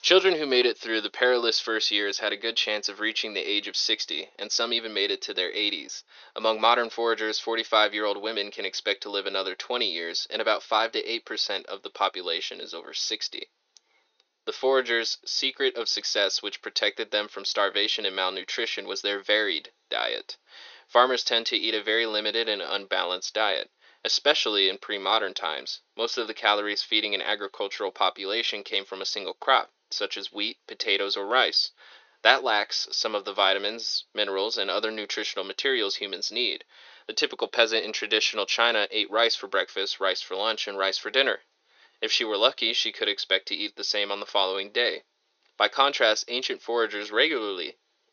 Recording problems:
thin; very; fading below 350 Hz
high frequencies cut off; noticeable; nothing above 6.5 kHz

